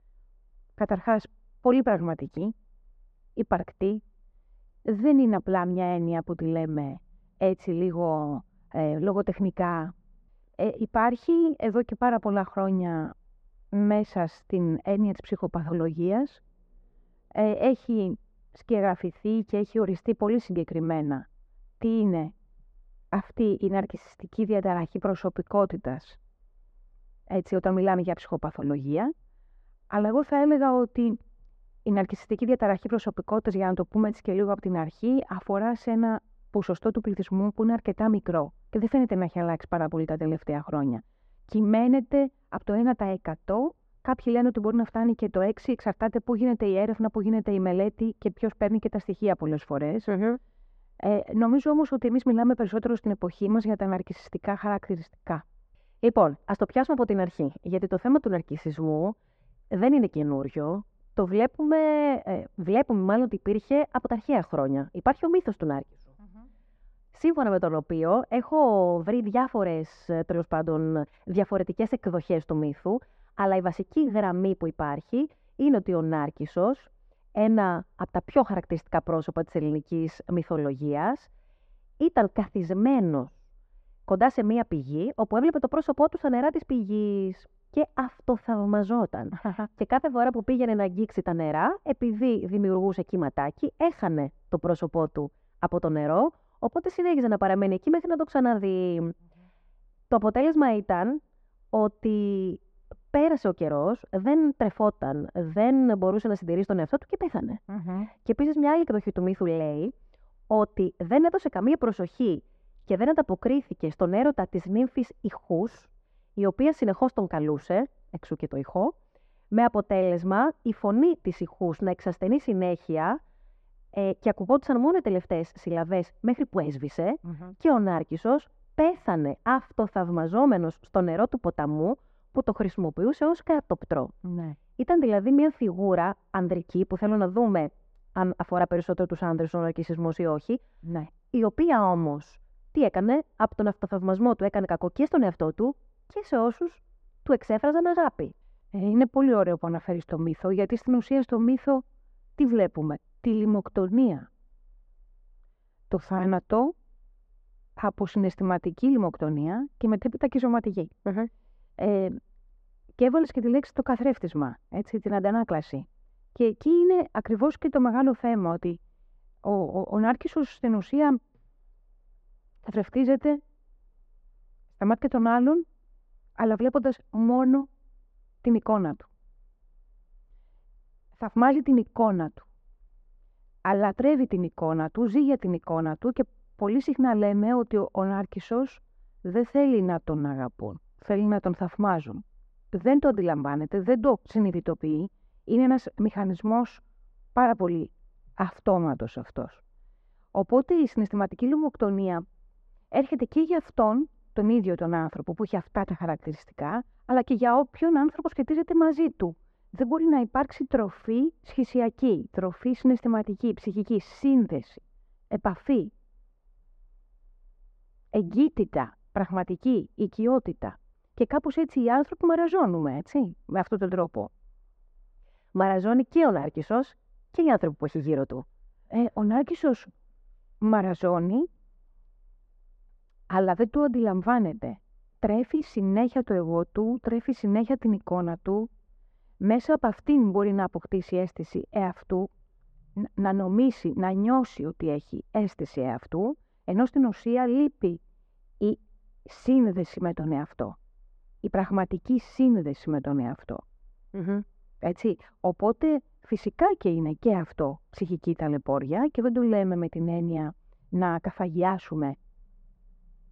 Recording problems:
muffled; very; fading above 1.5 kHz

